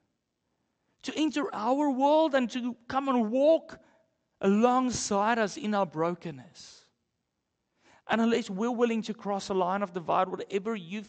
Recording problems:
high frequencies cut off; noticeable; nothing above 8 kHz

